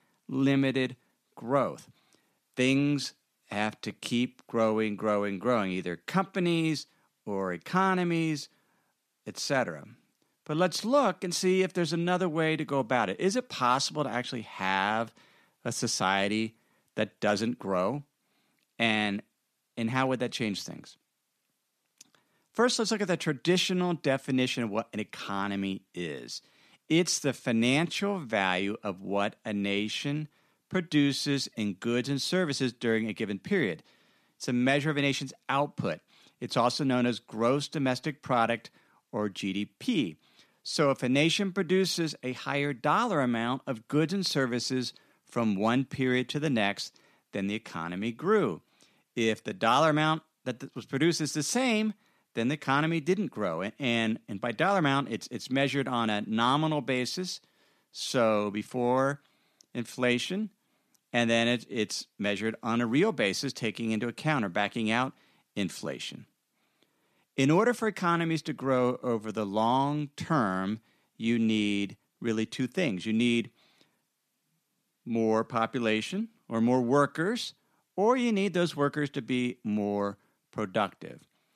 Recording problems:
none

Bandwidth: 14.5 kHz